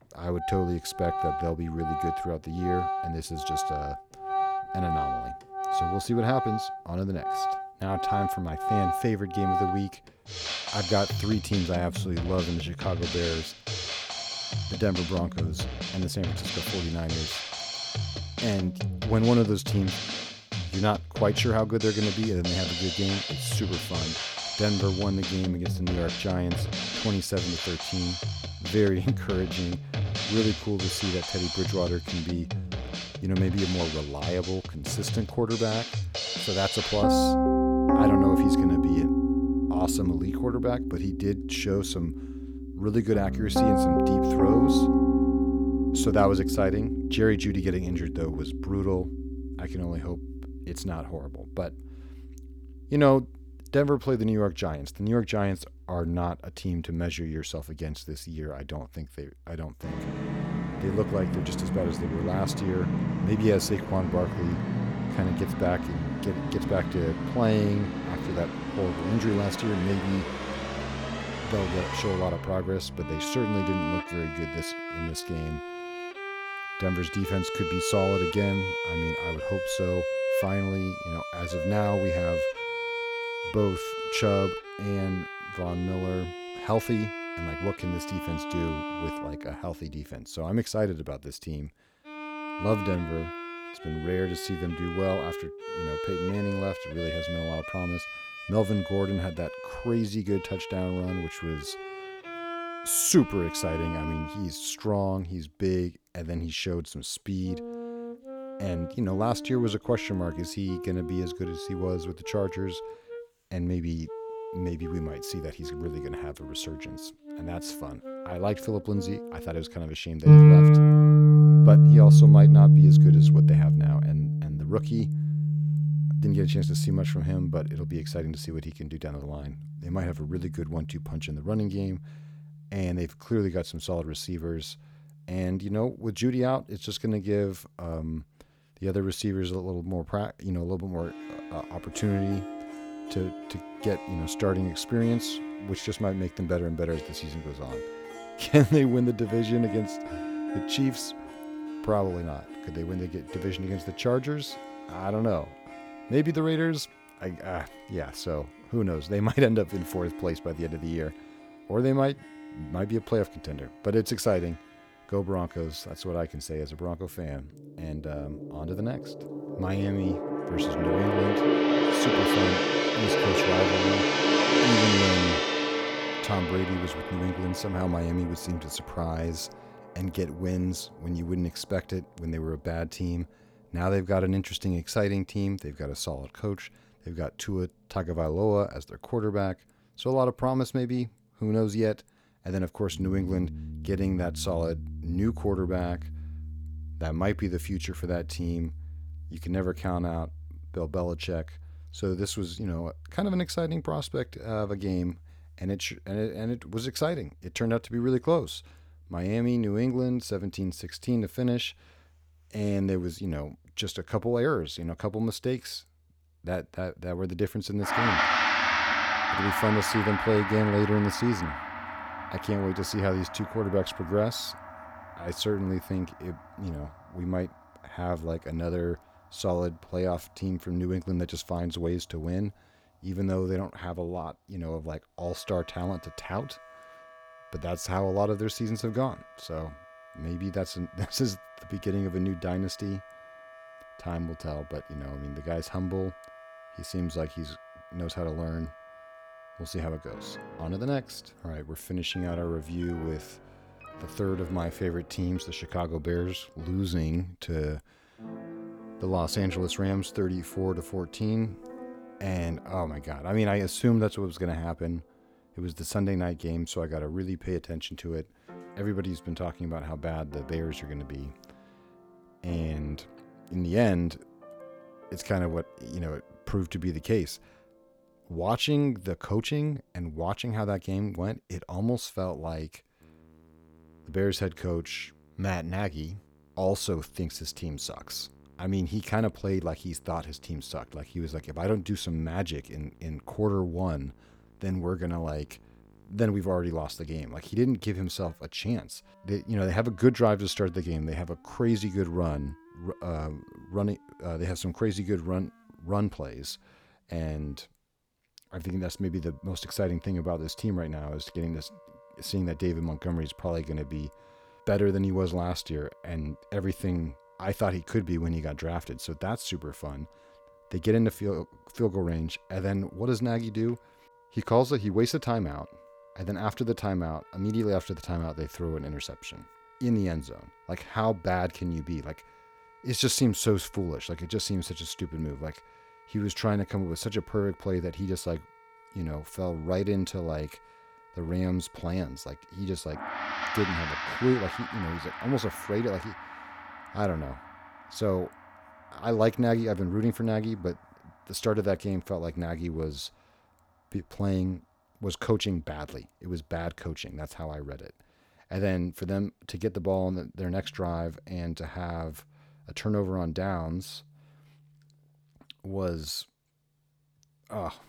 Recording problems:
background music; very loud; throughout; 3 dB above the speech

